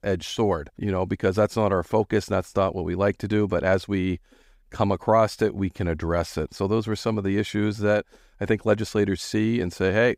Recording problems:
none

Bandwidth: 15.5 kHz